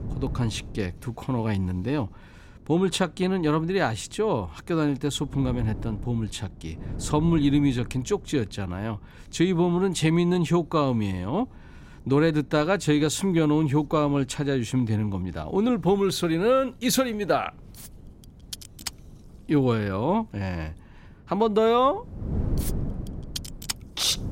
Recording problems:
wind noise on the microphone; occasional gusts; 25 dB below the speech

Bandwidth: 16 kHz